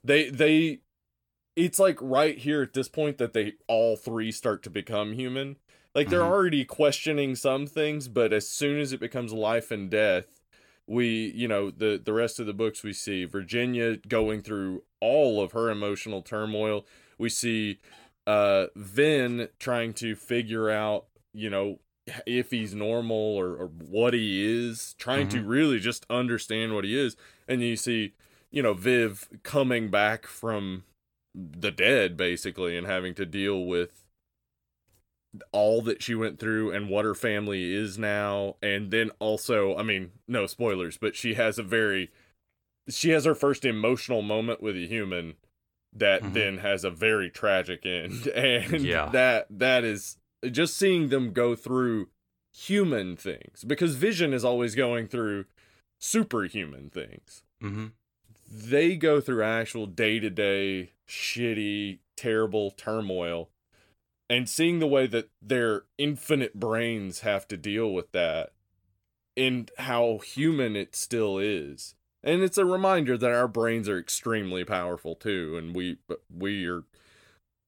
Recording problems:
none

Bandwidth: 18 kHz